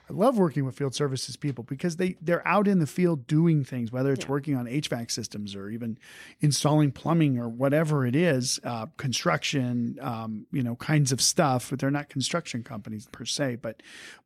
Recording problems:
none

